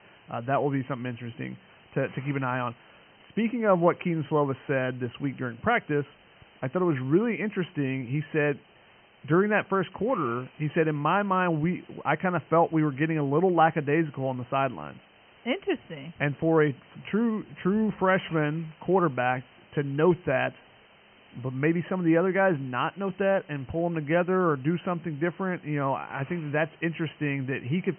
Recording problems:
high frequencies cut off; severe; nothing above 3 kHz
hiss; faint; throughout; 25 dB below the speech

